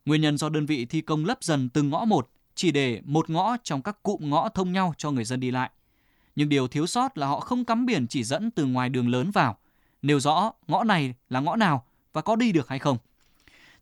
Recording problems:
none

